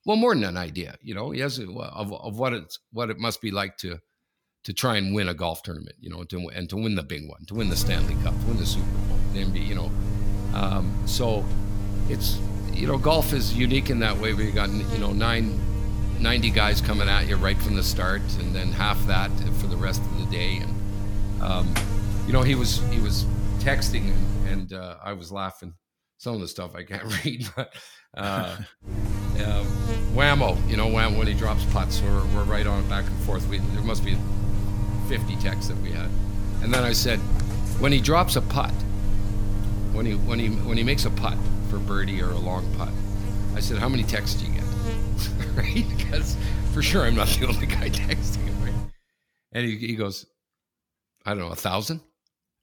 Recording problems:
electrical hum; loud; from 7.5 to 25 s and from 29 to 49 s; 50 Hz, 10 dB below the speech

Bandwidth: 18.5 kHz